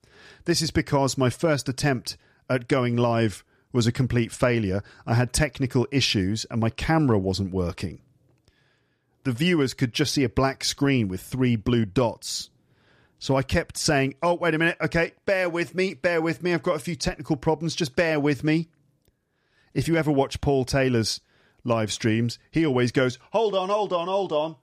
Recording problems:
none

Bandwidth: 14.5 kHz